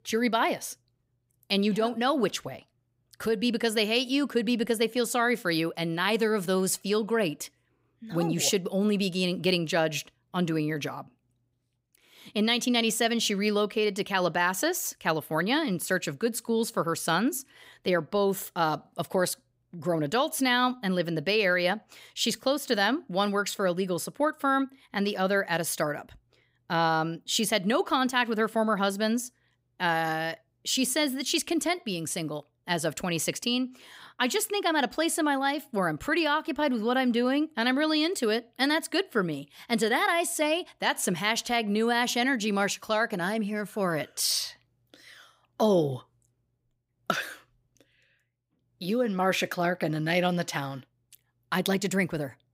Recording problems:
none

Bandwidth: 15.5 kHz